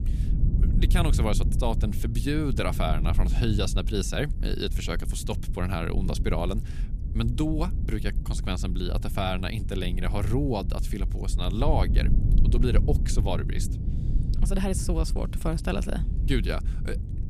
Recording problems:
low rumble; noticeable; throughout; 10 dB below the speech

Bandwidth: 14.5 kHz